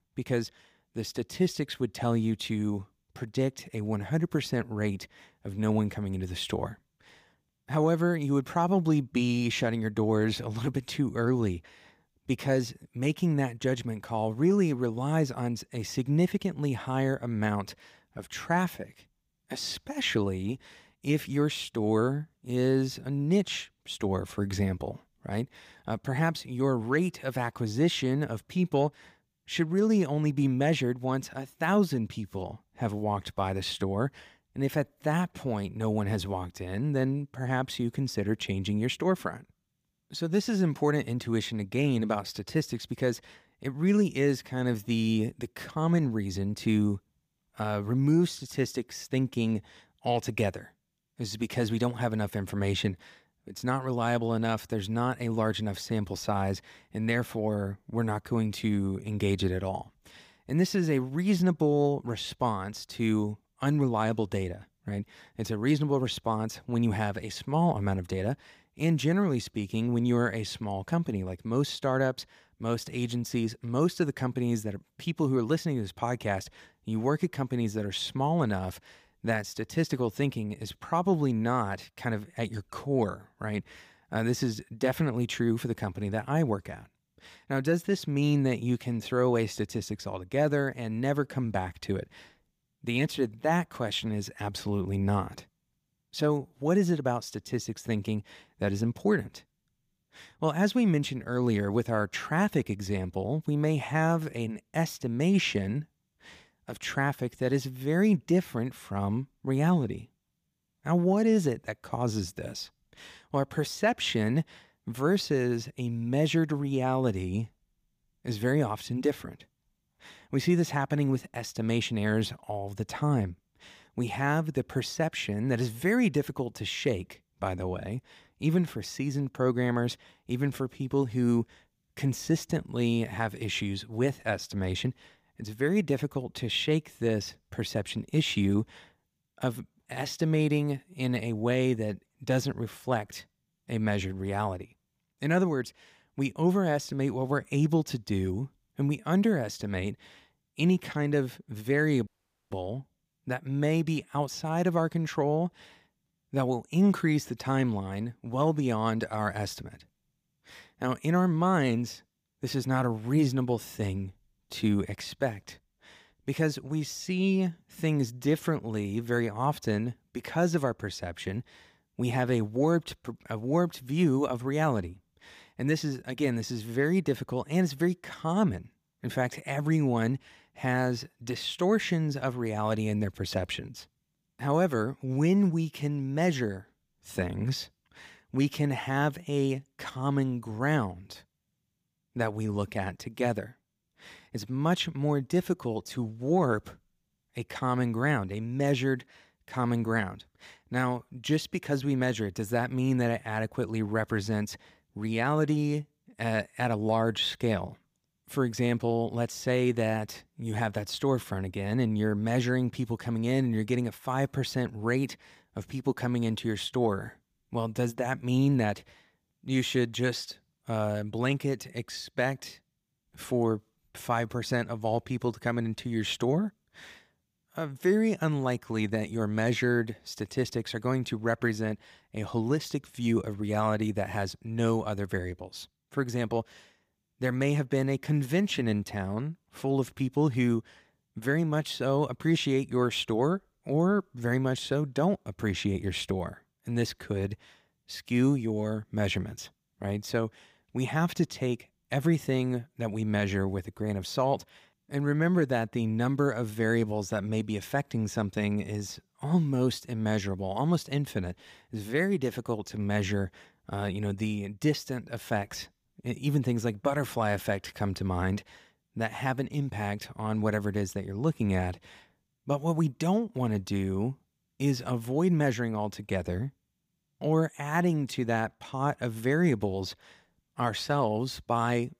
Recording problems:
audio cutting out; at 2:32

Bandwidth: 15 kHz